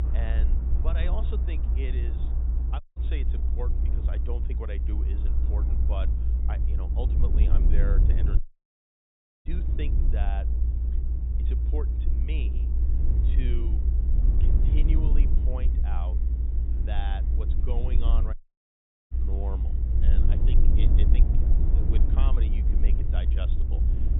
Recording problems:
high frequencies cut off; severe; nothing above 4 kHz
low rumble; loud; throughout; 2 dB below the speech
rain or running water; noticeable; throughout; 15 dB below the speech
audio cutting out; at 3 s, at 8.5 s for 1 s and at 18 s for 1 s

